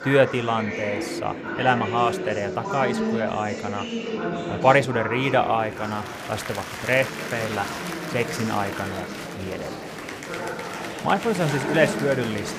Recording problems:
murmuring crowd; loud; throughout; 6 dB below the speech

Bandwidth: 15 kHz